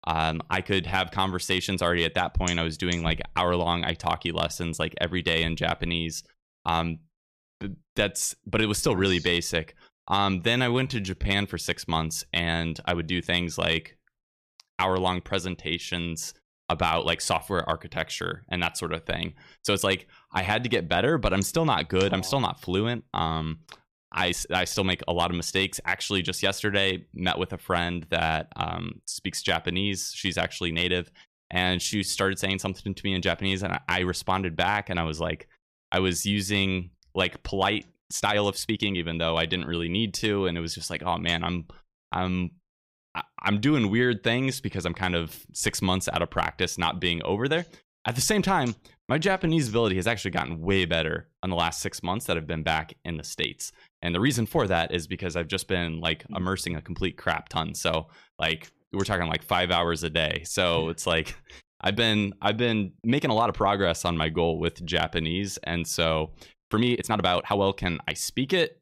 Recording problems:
uneven, jittery; strongly; from 11 s to 1:08

